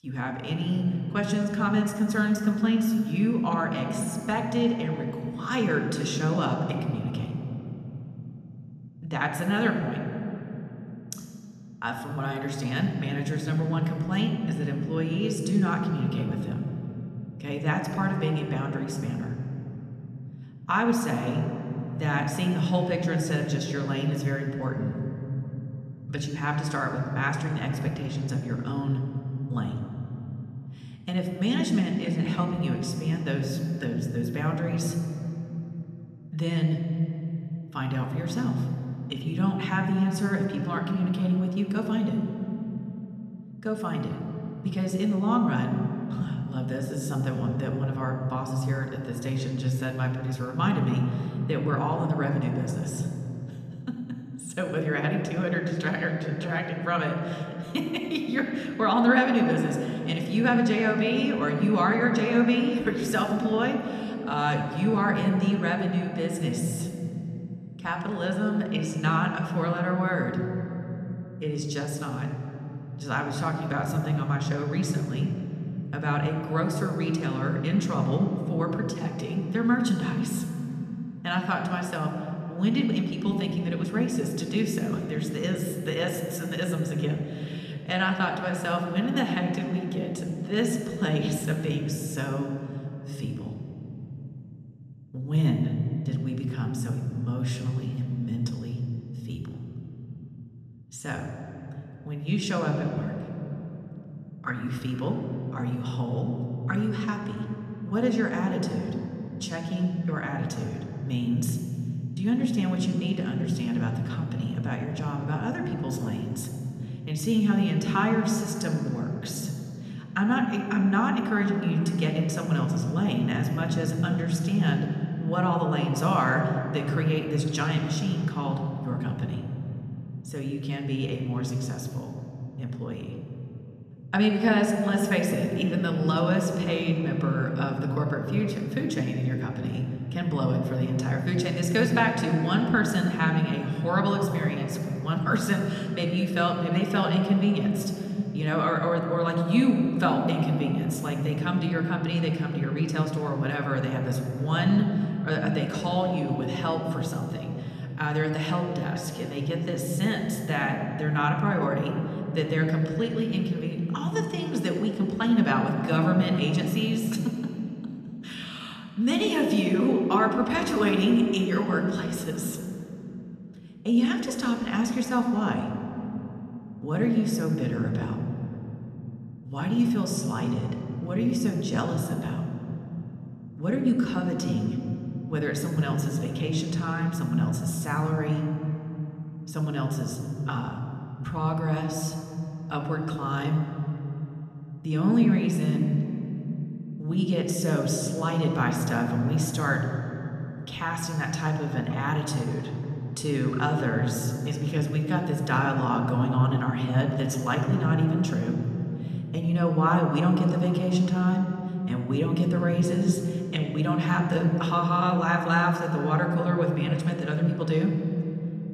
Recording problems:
room echo; noticeable; dies away in 3 s
off-mic speech; somewhat distant

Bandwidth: 14 kHz